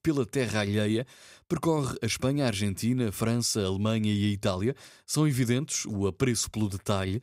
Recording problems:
none

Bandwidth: 15.5 kHz